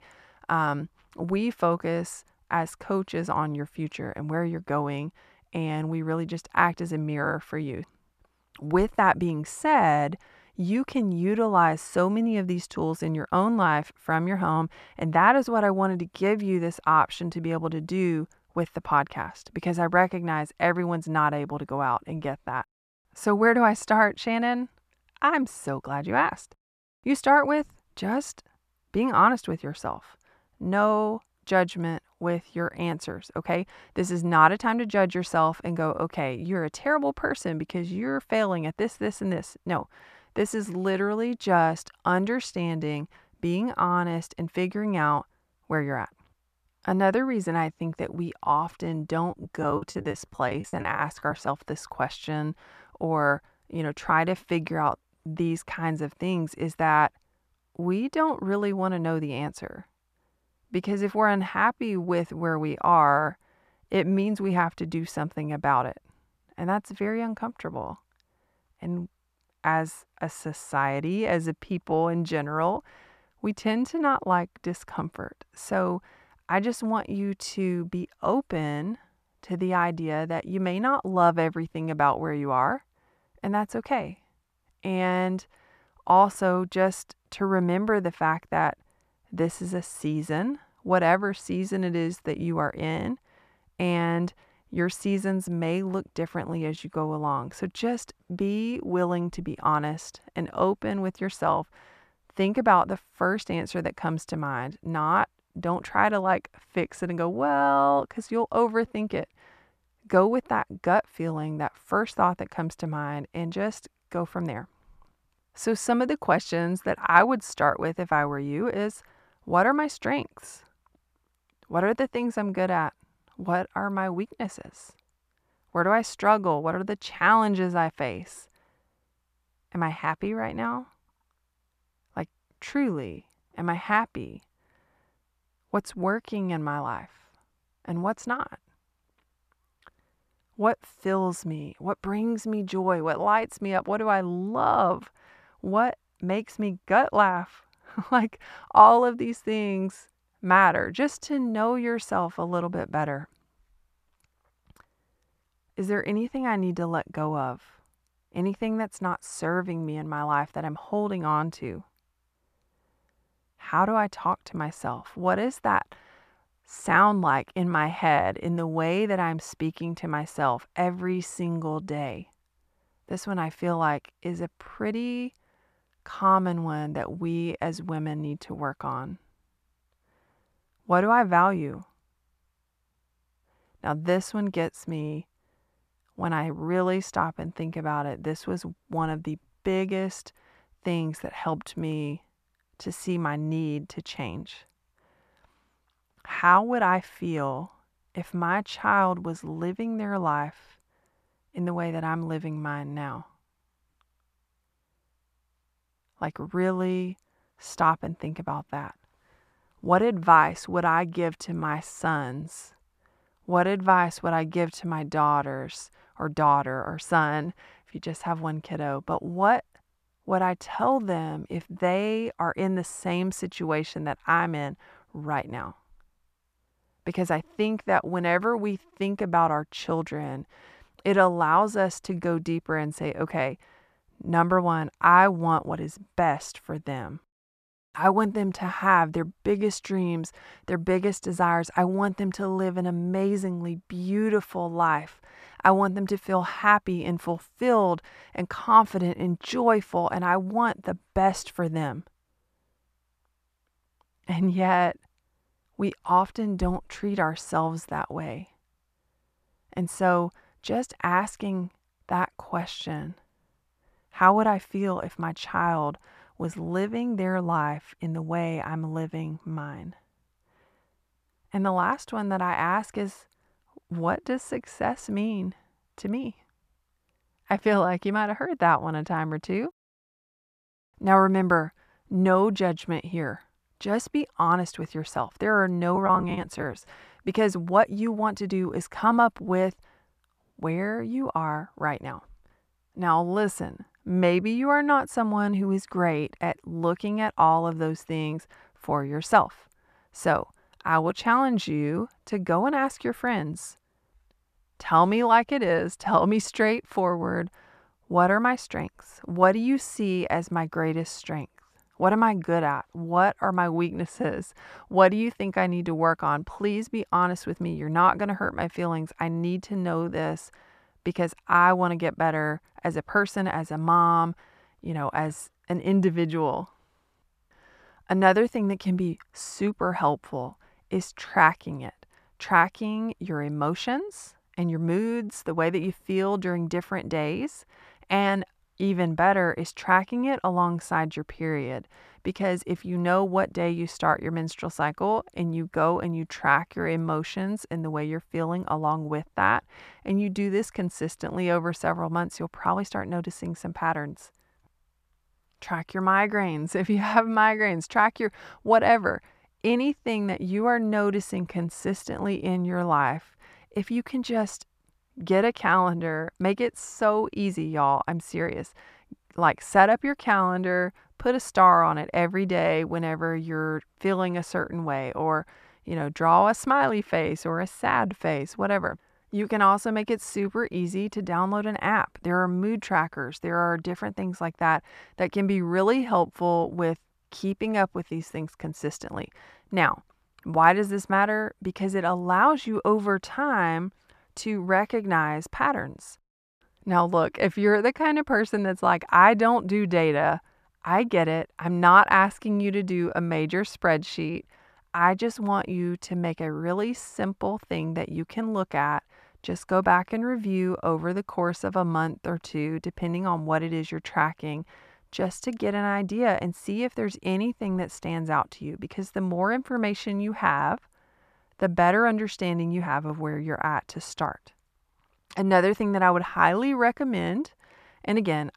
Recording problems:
muffled; slightly; fading above 3 kHz
choppy; very; from 49 to 51 s and at 4:46; 20% of the speech affected

